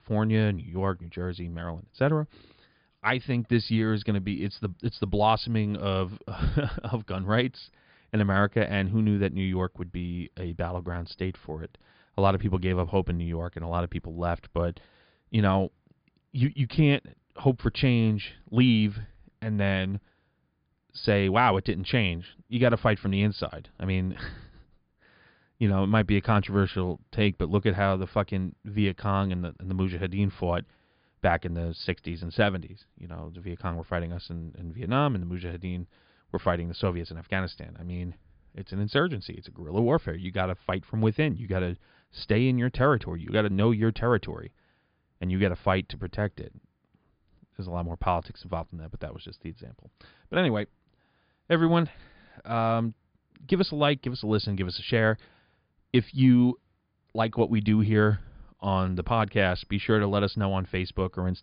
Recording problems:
high frequencies cut off; severe; nothing above 5 kHz

